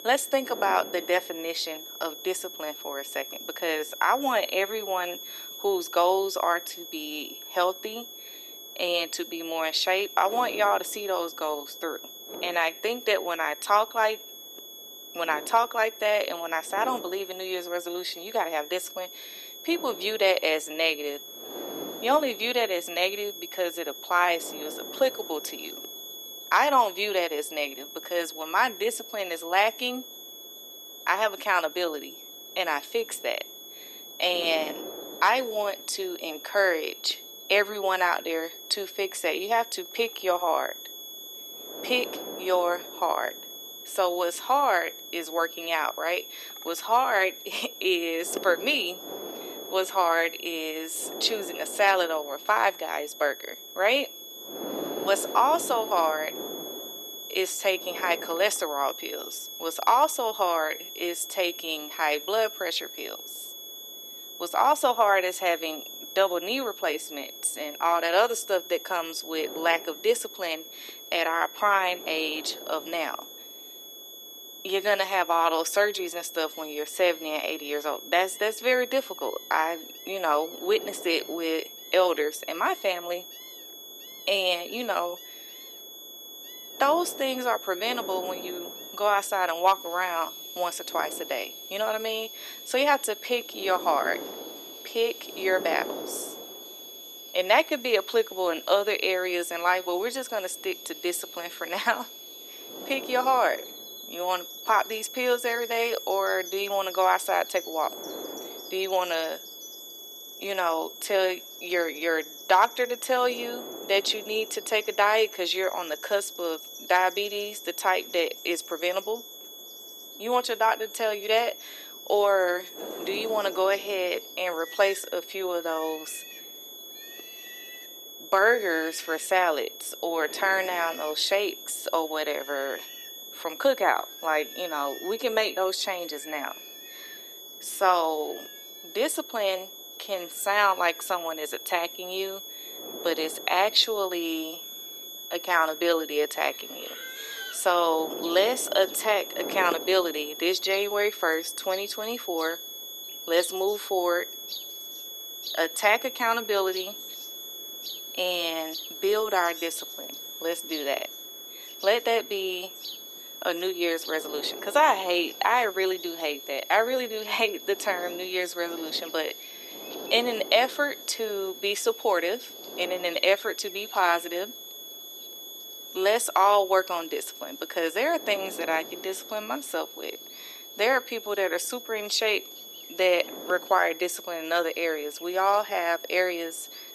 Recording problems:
thin; very; fading below 350 Hz
high-pitched whine; noticeable; throughout; 3.5 kHz, 15 dB below the speech
wind noise on the microphone; occasional gusts; 20 dB below the speech
animal sounds; faint; throughout; 20 dB below the speech

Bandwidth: 13.5 kHz